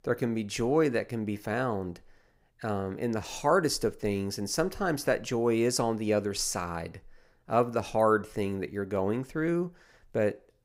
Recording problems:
none

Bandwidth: 15.5 kHz